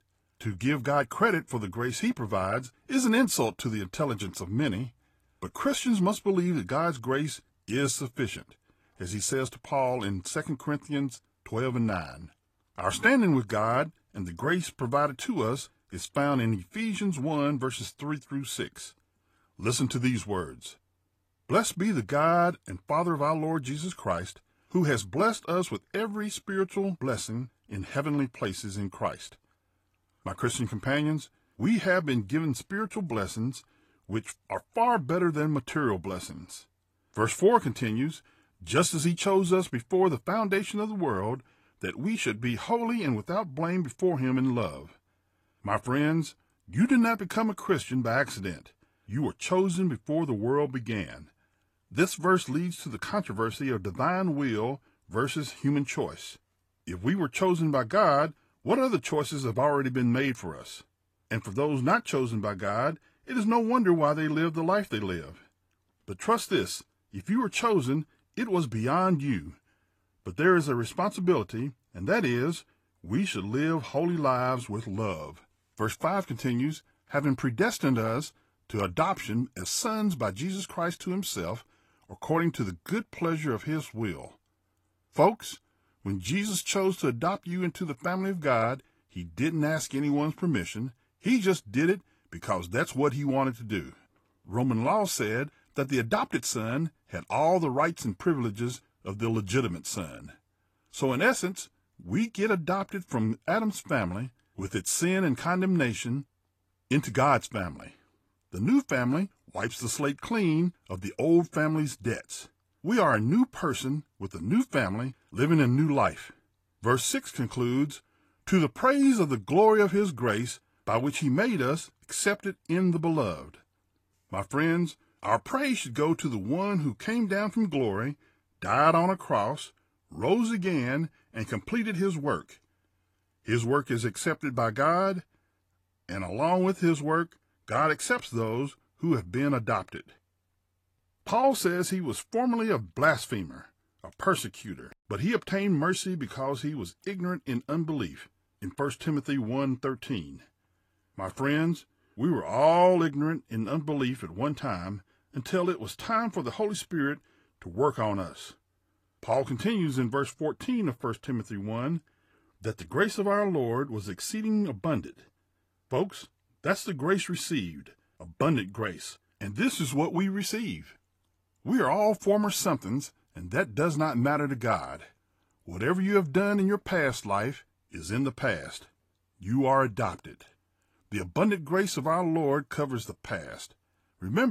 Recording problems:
garbled, watery; slightly; nothing above 14.5 kHz
abrupt cut into speech; at the end

